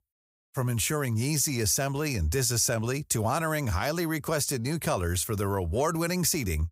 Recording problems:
none

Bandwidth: 15.5 kHz